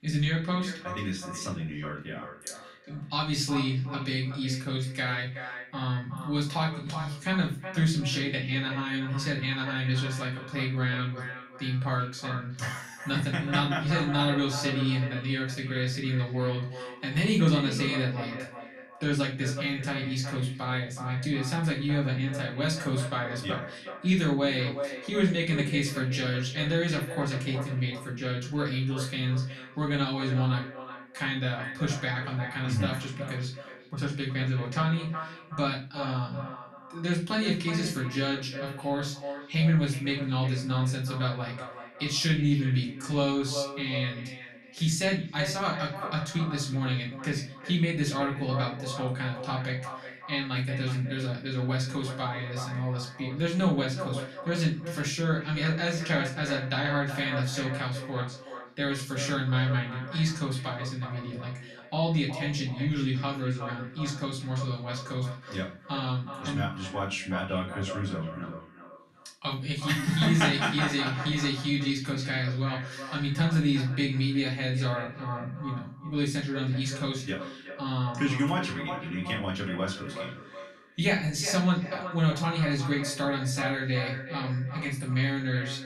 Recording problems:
echo of what is said; strong; throughout; 370 ms later, 10 dB below the speech
off-mic speech; far
room echo; slight; dies away in 0.3 s

